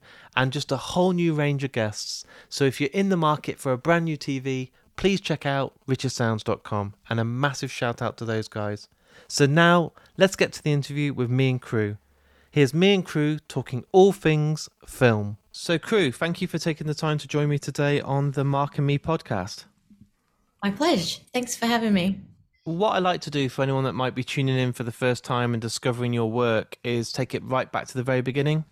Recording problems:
none

